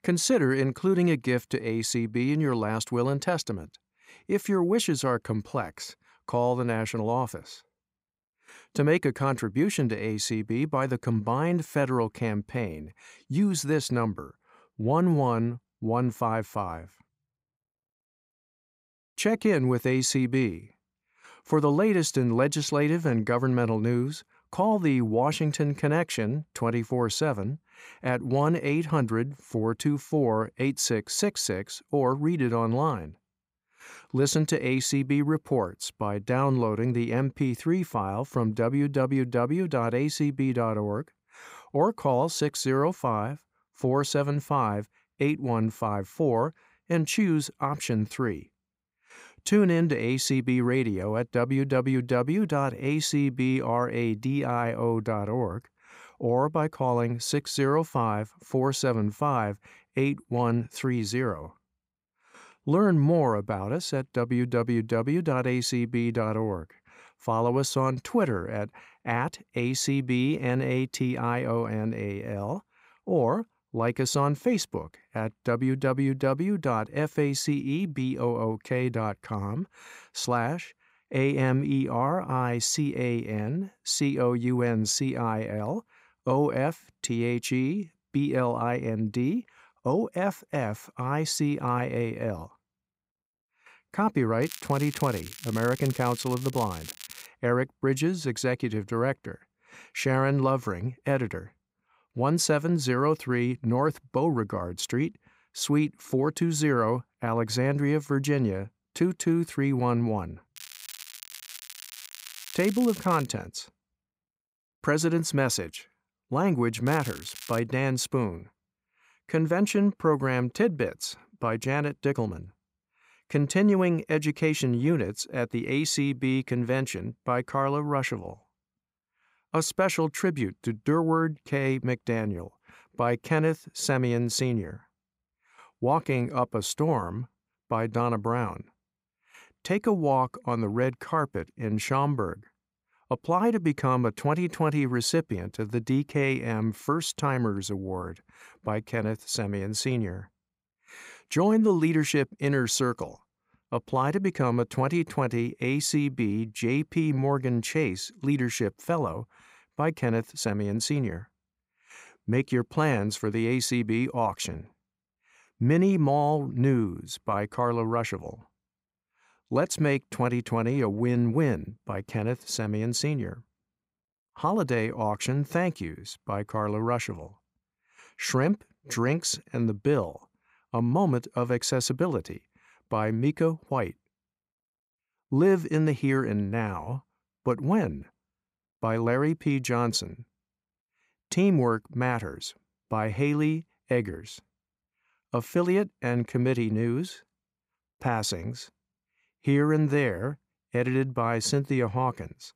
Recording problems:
crackling; noticeable; from 1:34 to 1:37, from 1:51 to 1:53 and at 1:57; 15 dB below the speech

